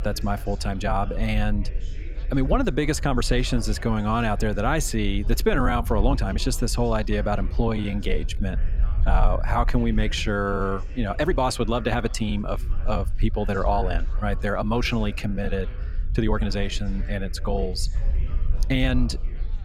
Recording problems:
background chatter; faint; throughout; 4 voices, 20 dB below the speech
low rumble; faint; throughout; 25 dB below the speech
uneven, jittery; strongly; from 0.5 to 19 s

